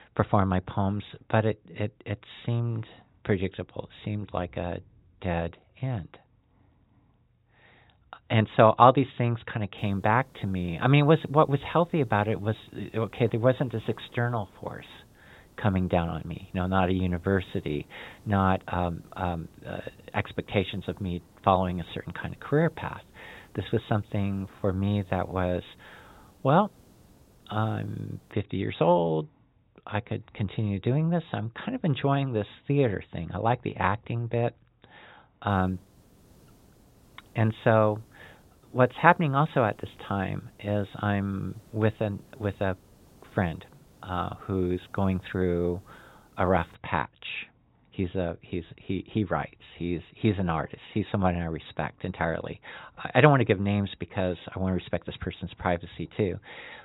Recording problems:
high frequencies cut off; severe; nothing above 4 kHz
hiss; faint; from 10 to 28 s and from 35 to 47 s; 30 dB below the speech

